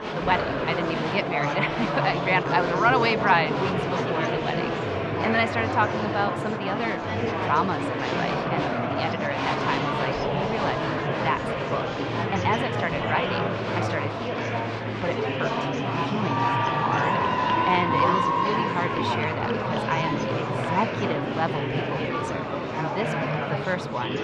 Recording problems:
muffled; very slightly; fading above 4 kHz
murmuring crowd; very loud; throughout; 2 dB above the speech

